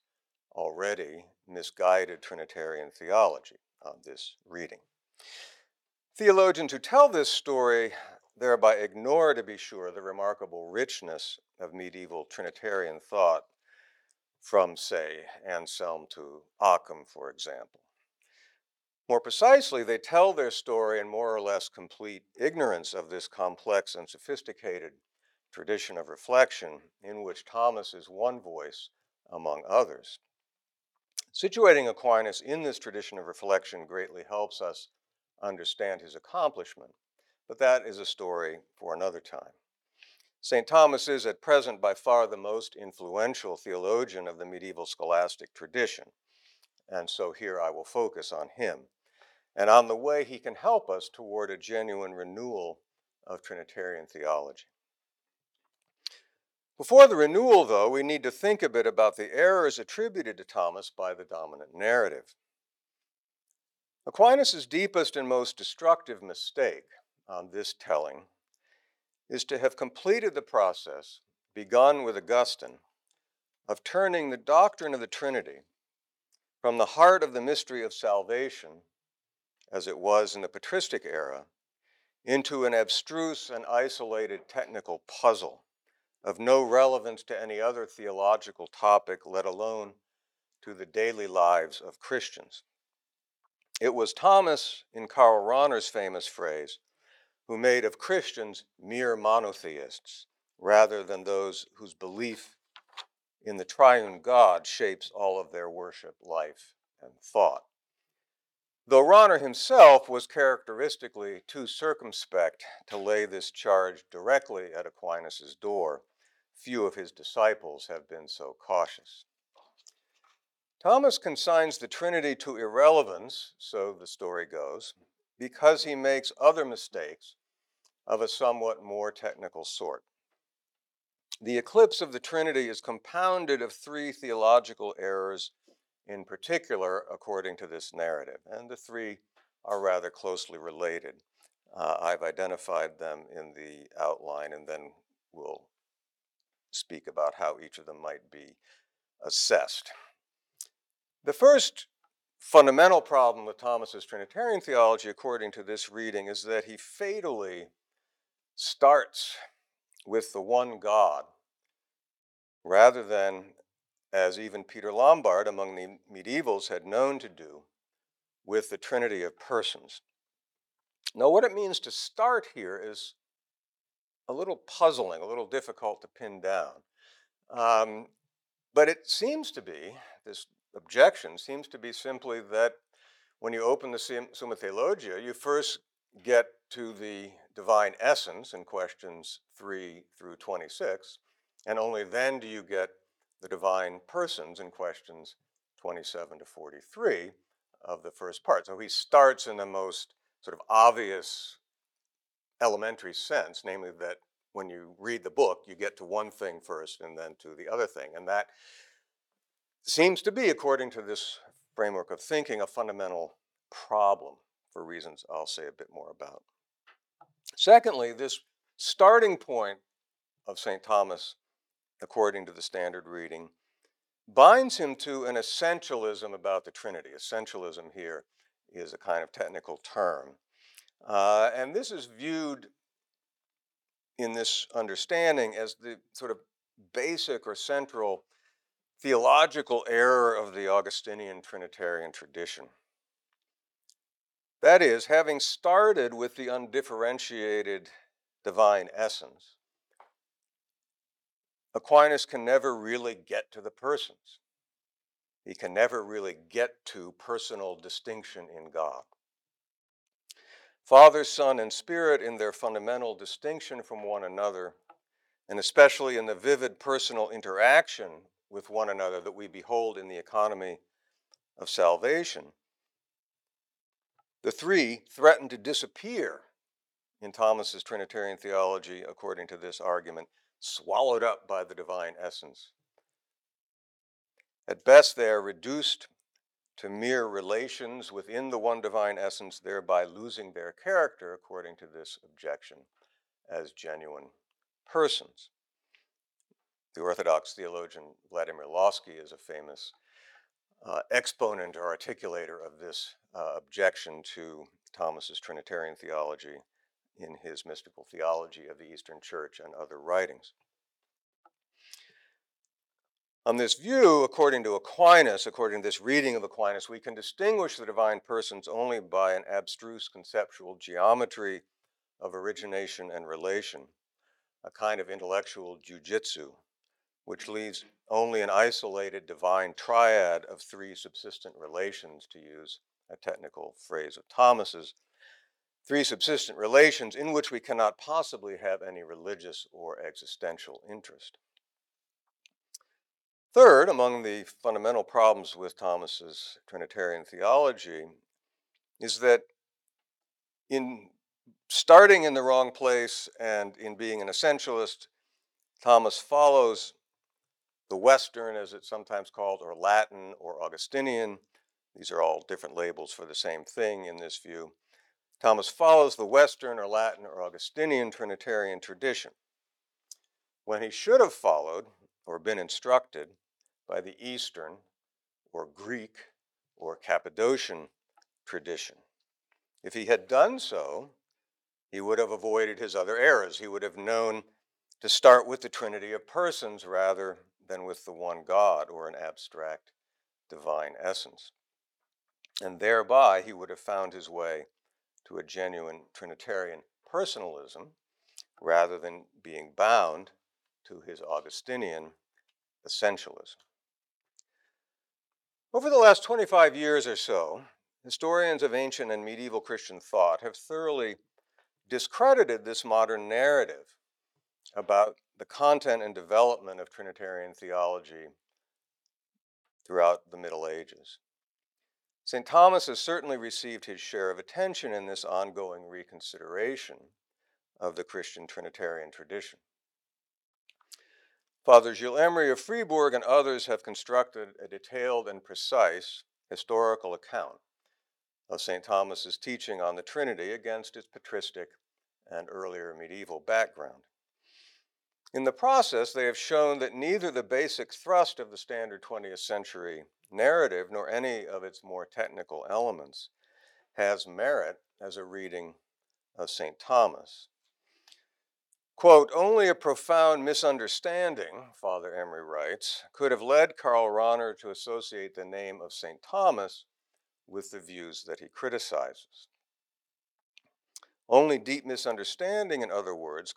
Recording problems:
thin; somewhat; fading below 450 Hz

